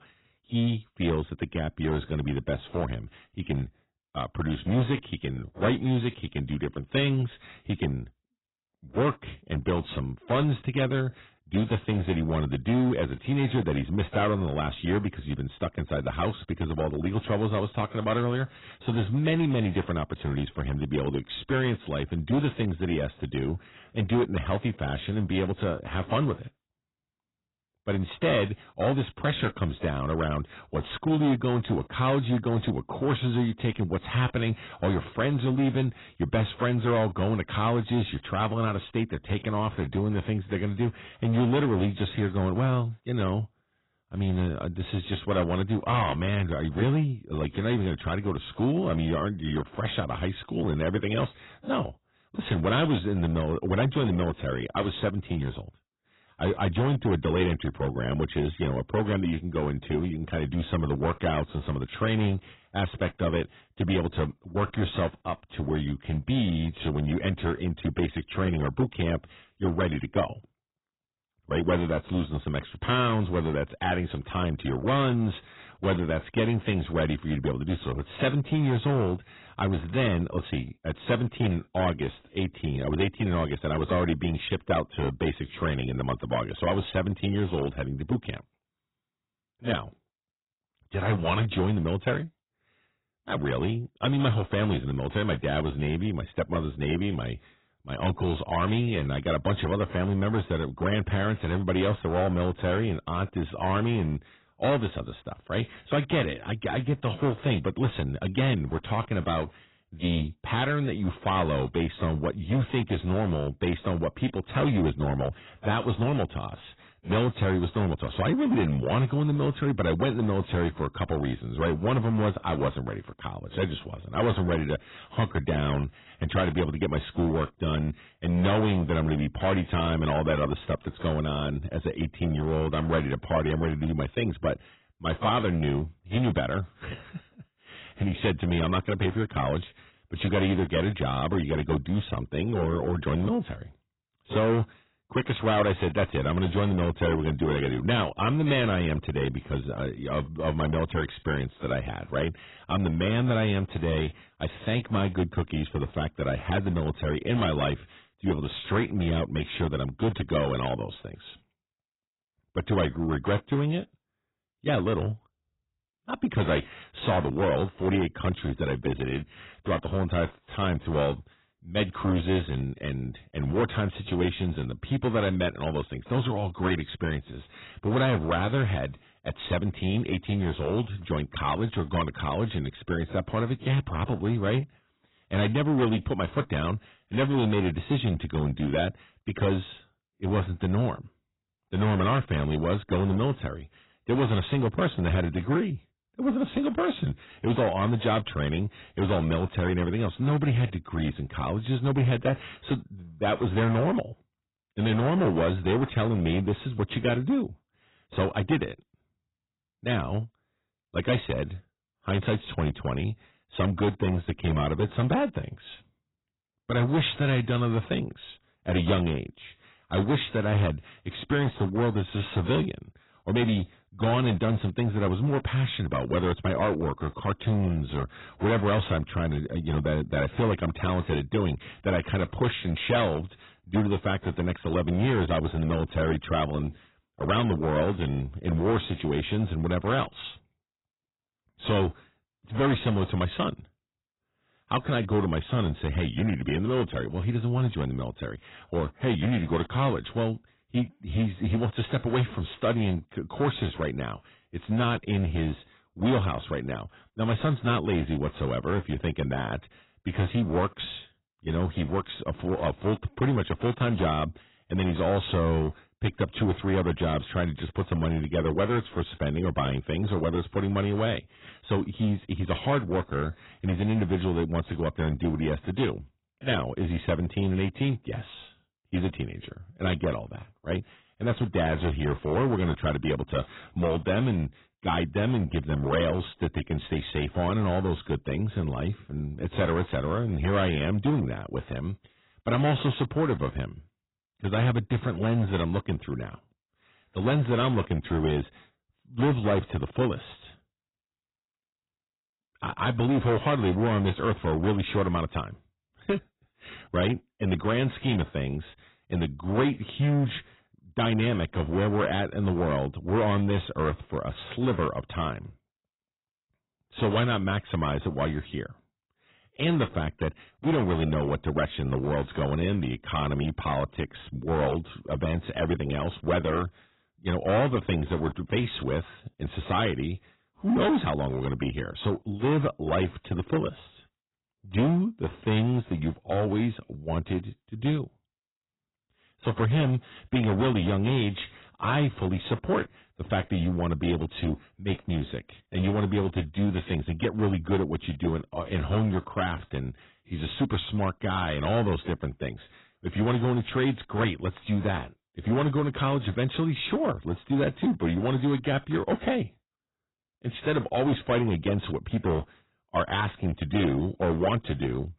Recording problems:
garbled, watery; badly; nothing above 4 kHz
distortion; slight; 7% of the sound clipped

